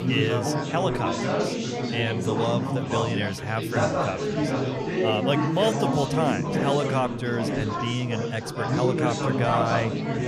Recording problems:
chatter from many people; very loud; throughout; 1 dB above the speech

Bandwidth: 15 kHz